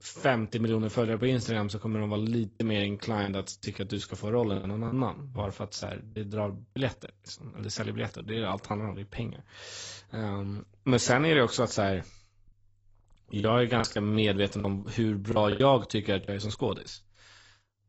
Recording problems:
garbled, watery; badly; nothing above 8 kHz
choppy; very; at 2.5 s, from 4.5 to 7 s and from 13 to 16 s; 7% of the speech affected

